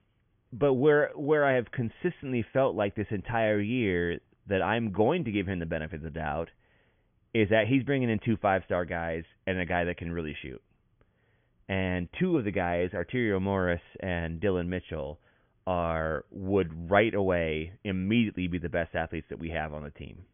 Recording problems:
high frequencies cut off; severe; nothing above 3.5 kHz

